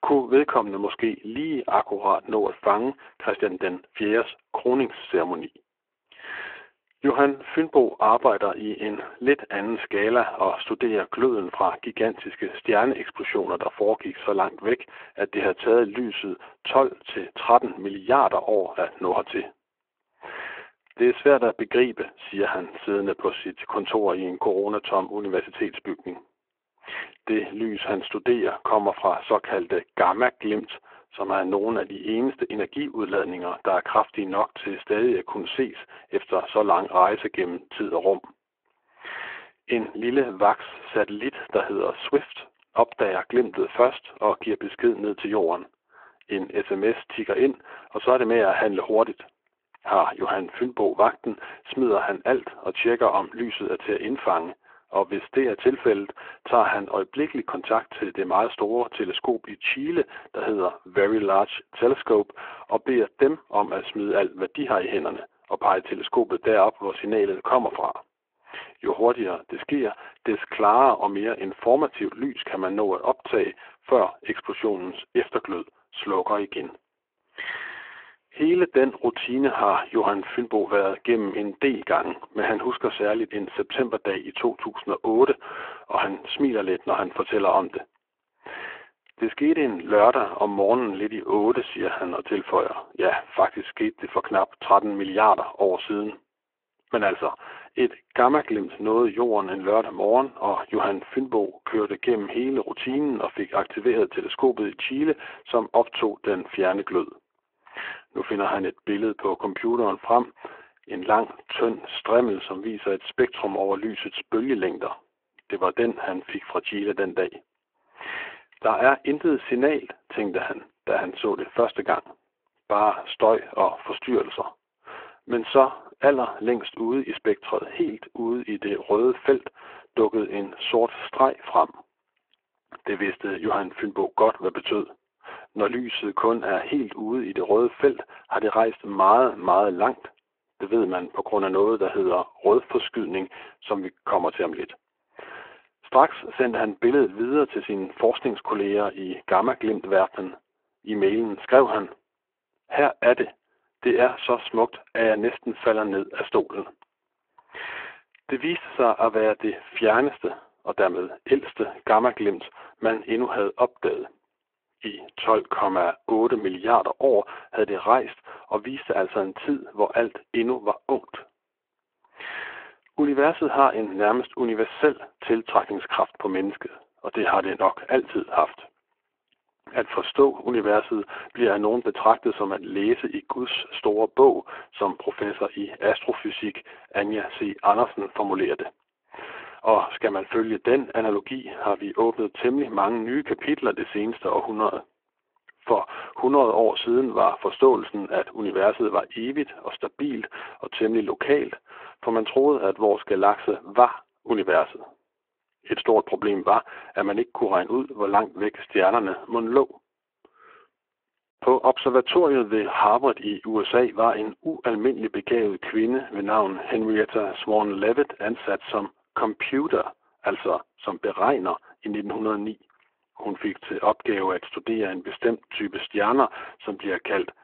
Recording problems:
phone-call audio

